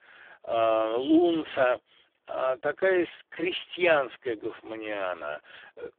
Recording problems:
phone-call audio; poor line

